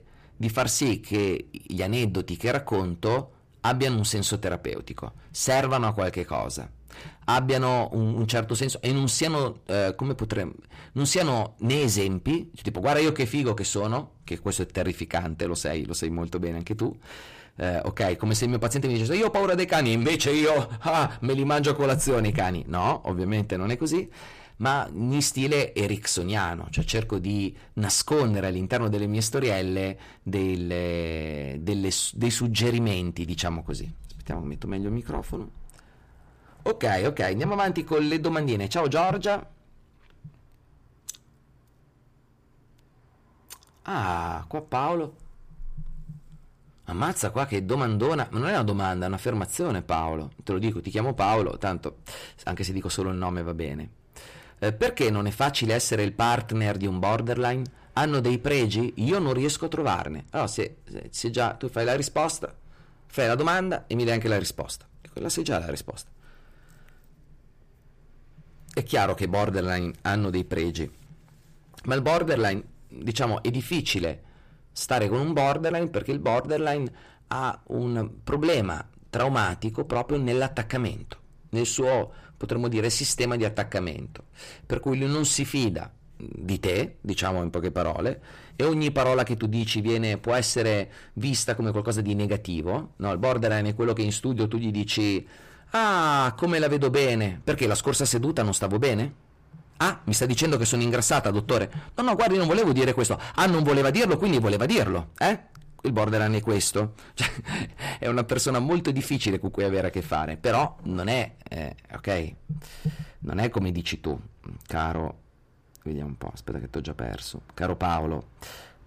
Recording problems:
distortion; heavy; 8 dB below the speech

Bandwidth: 15 kHz